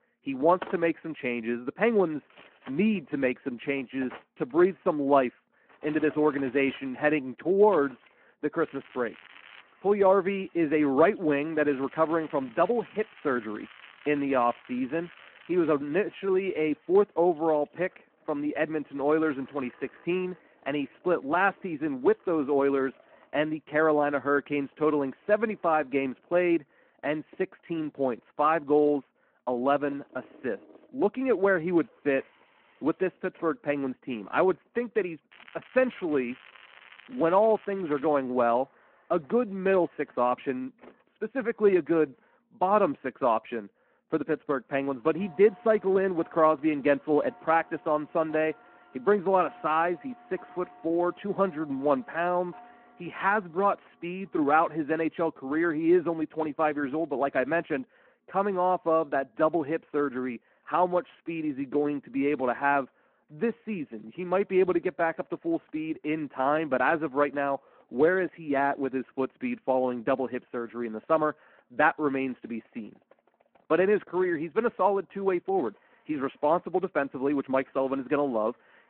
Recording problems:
muffled; very; fading above 3 kHz
phone-call audio
household noises; faint; throughout; 25 dB below the speech
crackling; faint; at 8.5 s, from 12 to 16 s and from 35 to 38 s; 25 dB below the speech

